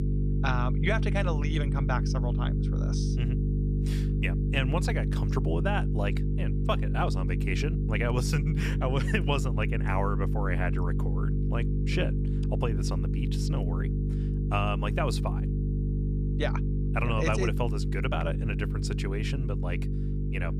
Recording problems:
electrical hum; loud; throughout; 50 Hz, 6 dB below the speech

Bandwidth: 14.5 kHz